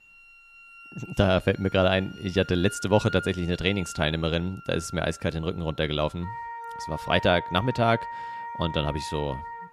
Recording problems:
background music; noticeable; throughout; 15 dB below the speech

